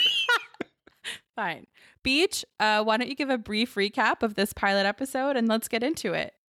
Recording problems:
abrupt cut into speech; at the start

